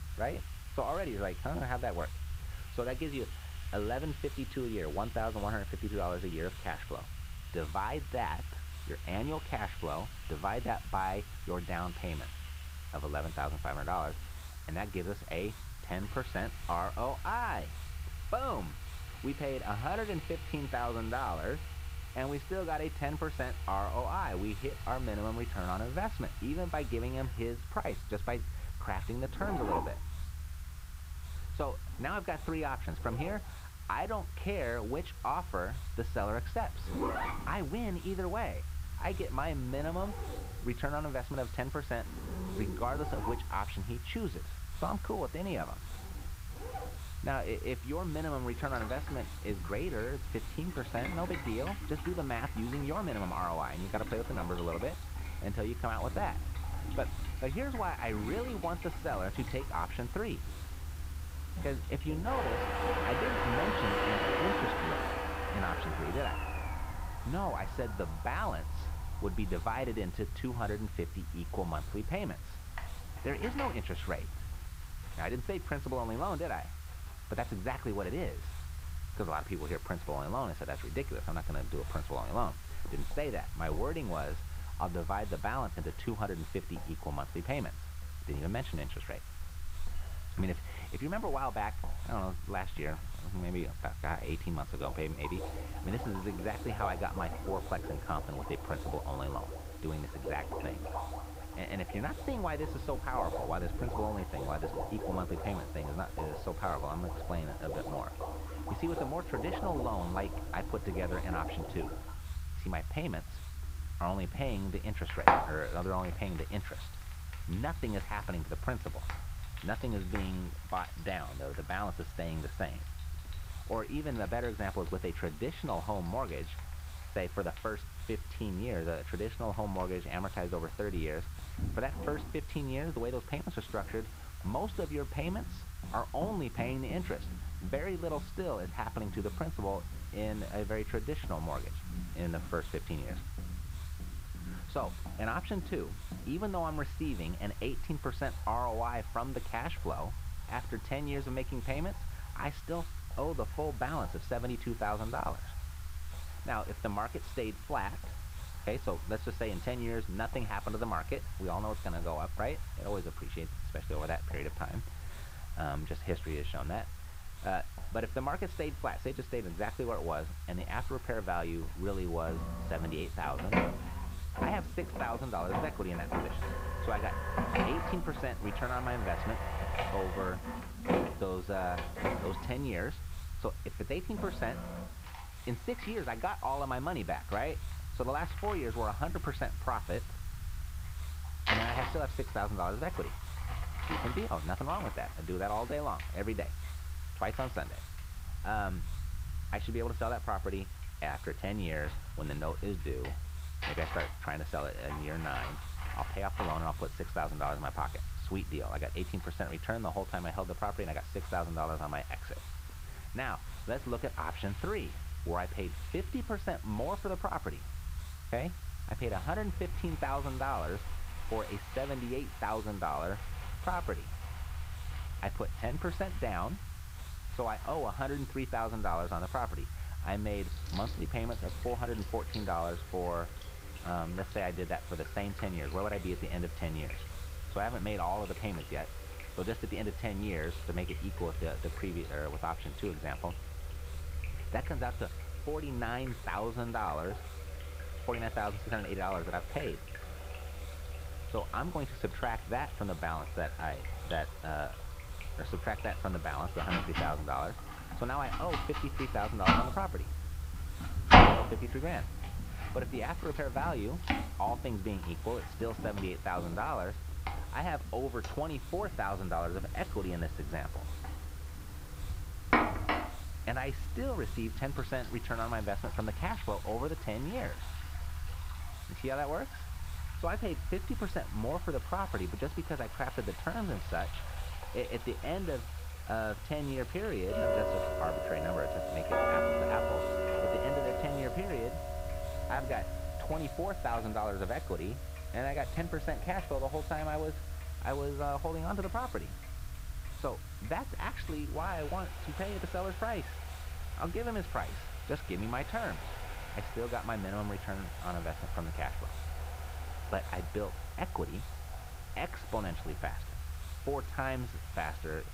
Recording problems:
muffled; very; fading above 2.5 kHz
household noises; loud; throughout; 1 dB below the speech
hiss; noticeable; throughout; 15 dB below the speech
low rumble; faint; throughout; 25 dB below the speech

